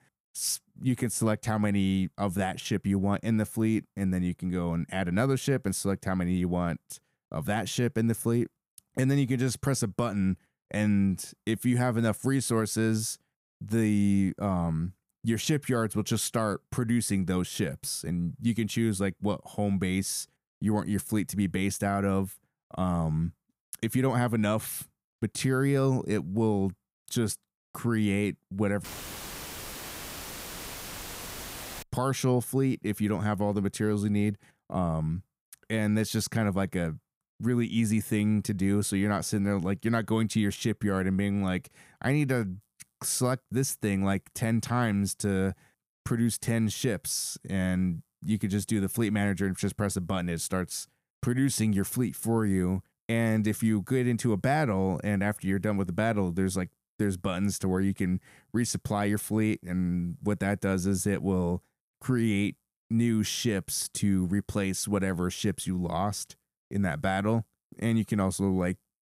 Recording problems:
audio cutting out; filled with static; at 29 s for 3 s

